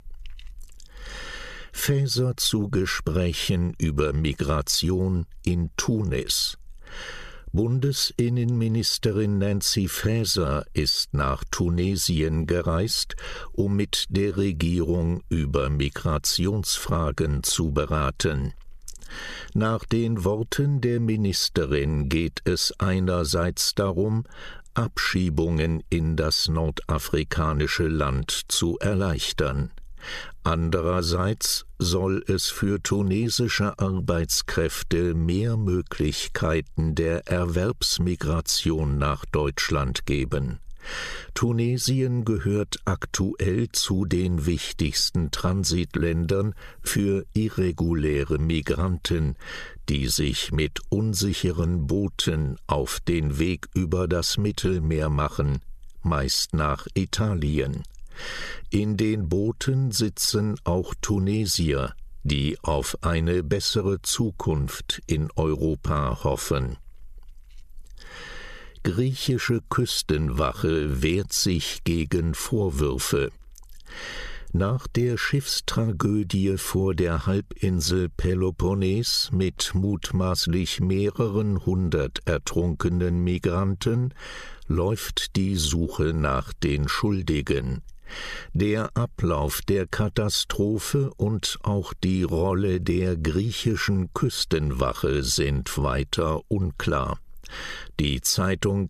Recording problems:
squashed, flat; somewhat

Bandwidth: 14 kHz